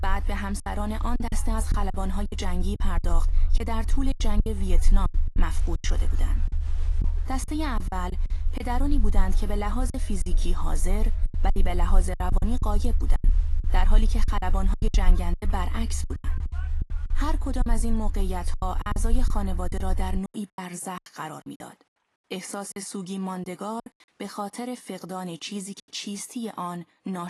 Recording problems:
garbled, watery; slightly; nothing above 11.5 kHz
low rumble; noticeable; until 20 s; 15 dB below the speech
crowd noise; faint; throughout; 25 dB below the speech
choppy; very; 10% of the speech affected
abrupt cut into speech; at the end

